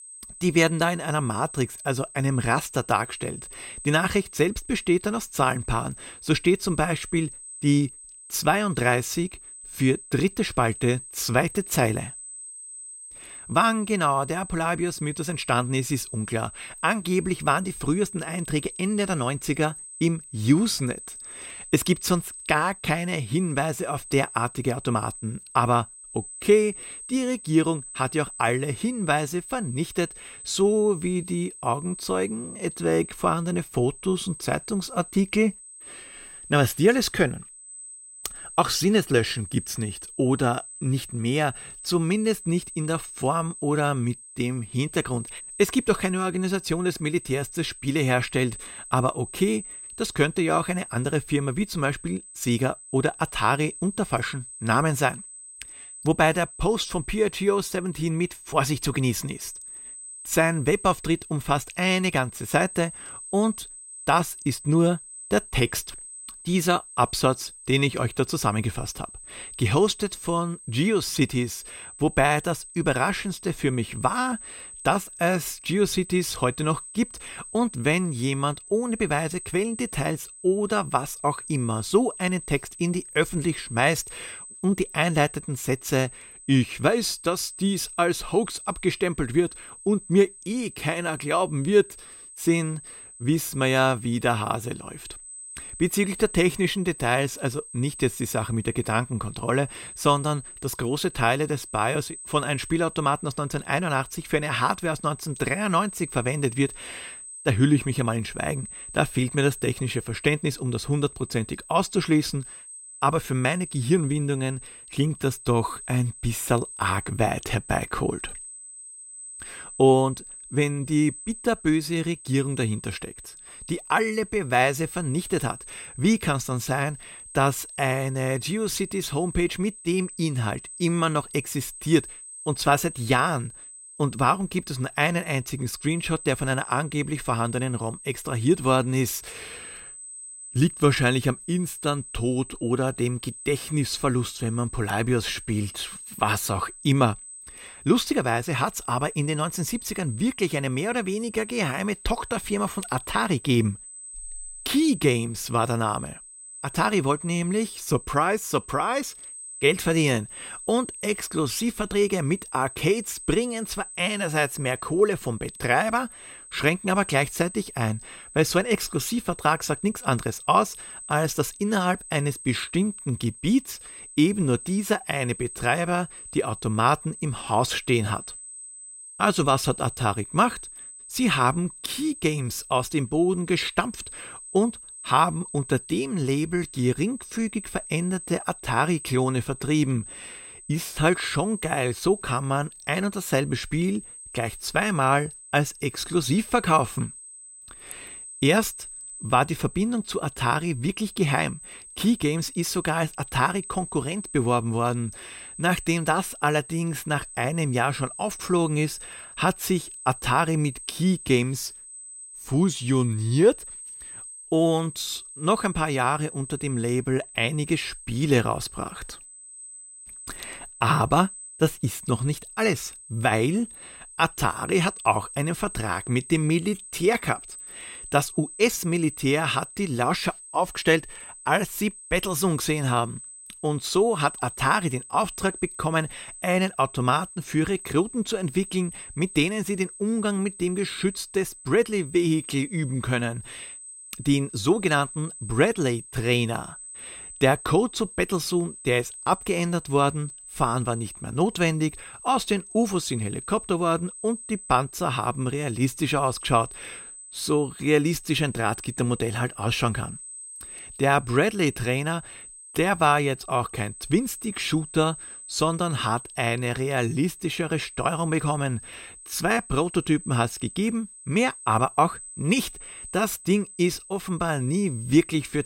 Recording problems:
high-pitched whine; noticeable; throughout; 8 kHz, 15 dB below the speech

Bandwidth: 16 kHz